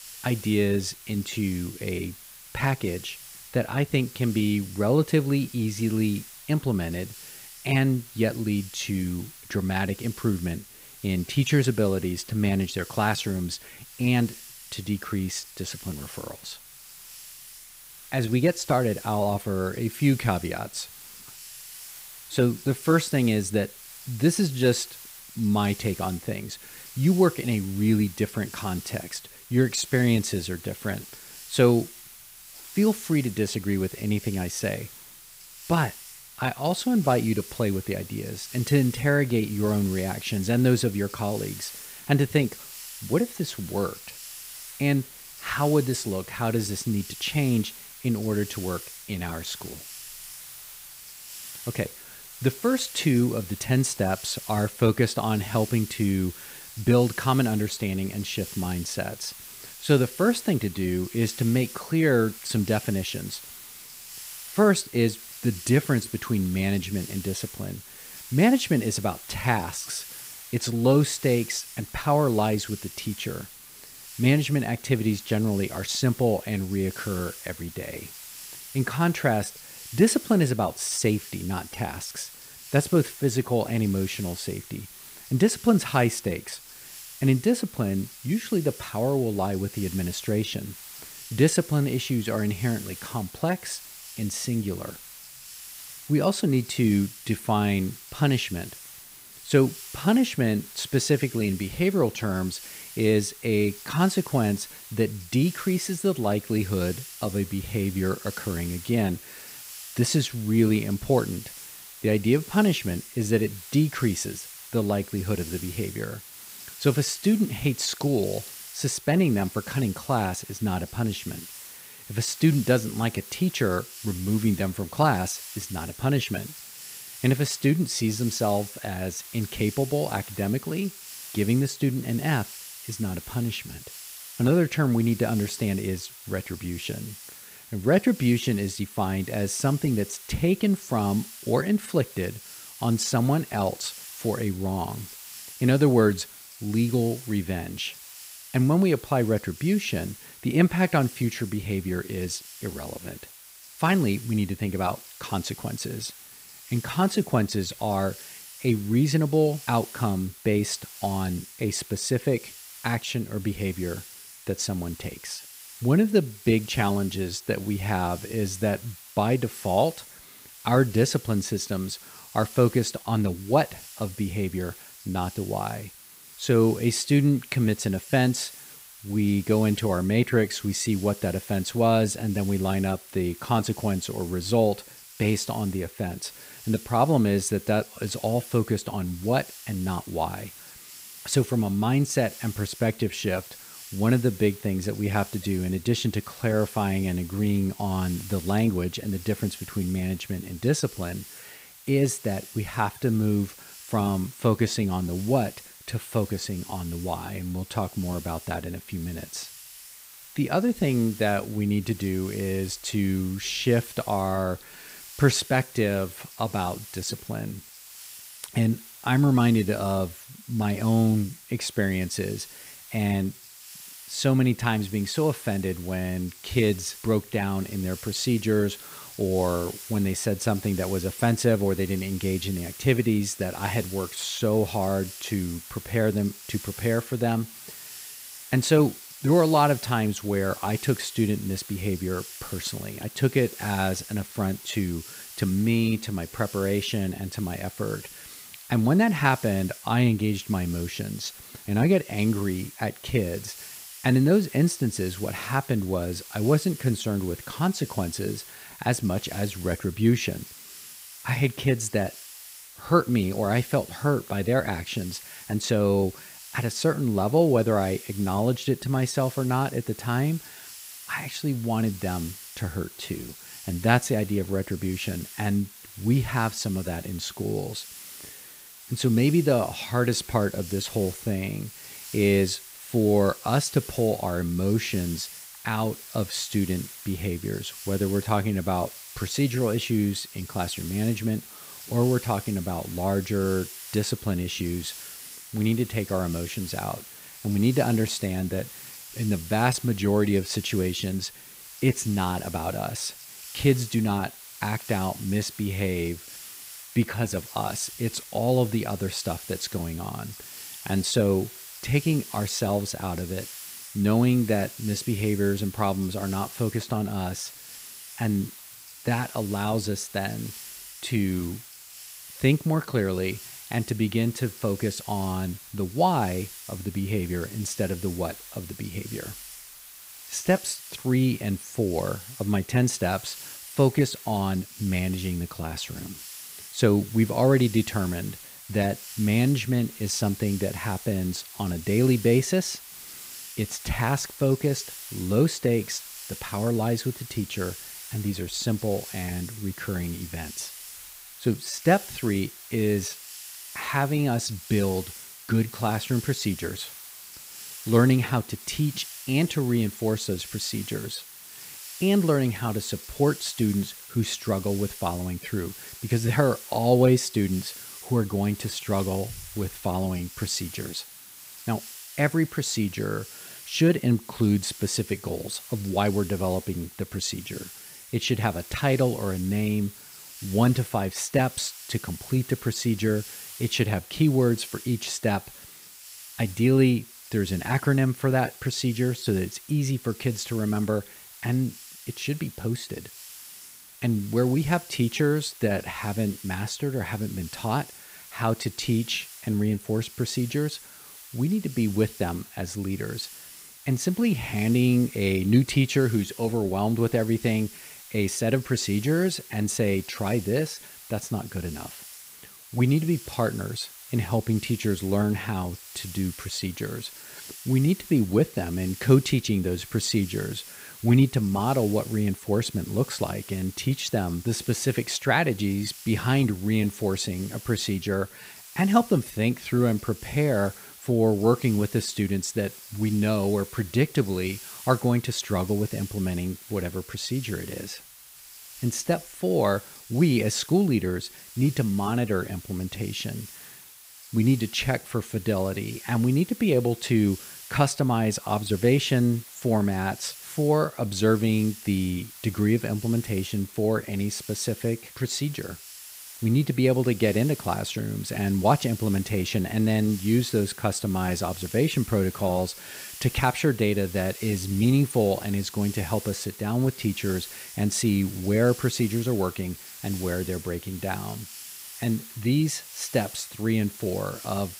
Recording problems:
hiss; noticeable; throughout; 15 dB below the speech
high-pitched whine; faint; until 3:12 and from 3:48 on; 10 kHz, 30 dB below the speech

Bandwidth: 15.5 kHz